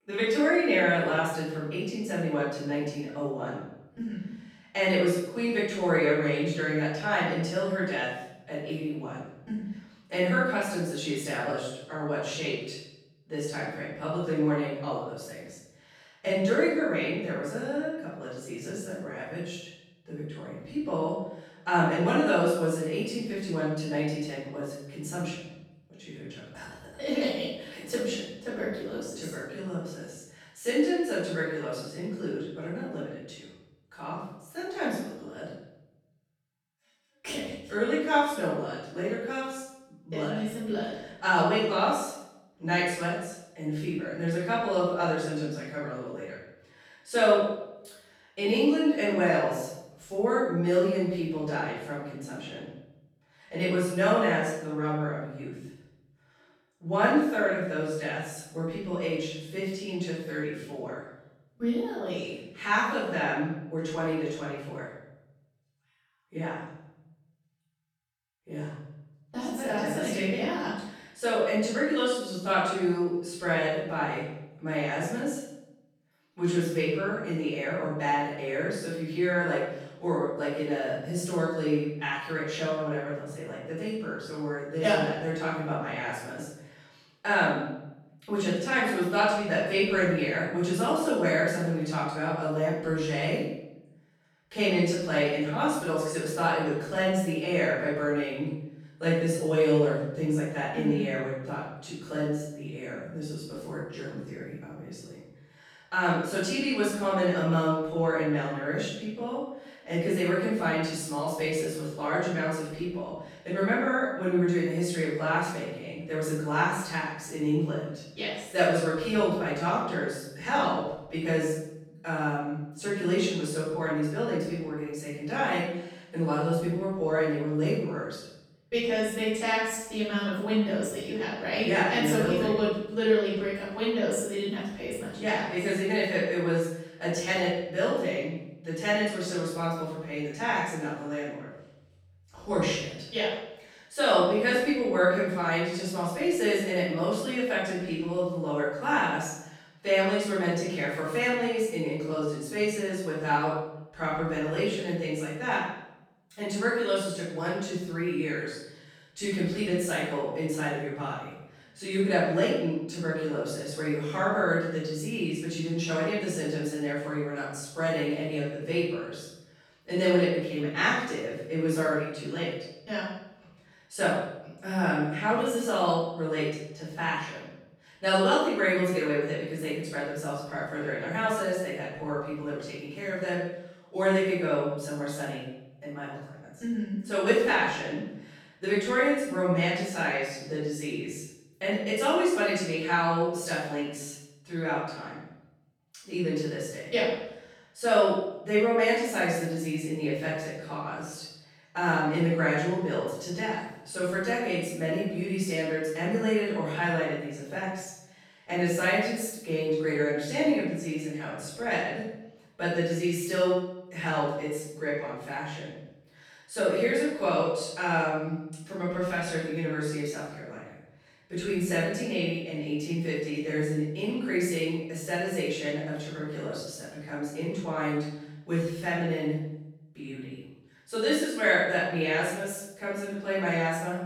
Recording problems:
room echo; strong; dies away in 0.8 s
off-mic speech; far

